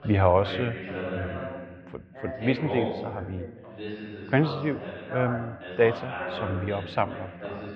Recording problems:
muffled; slightly; fading above 3 kHz
background chatter; loud; throughout; 2 voices, 7 dB below the speech

